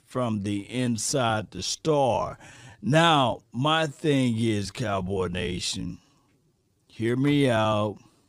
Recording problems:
wrong speed, natural pitch; too slow; 0.7 times normal speed

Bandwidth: 15 kHz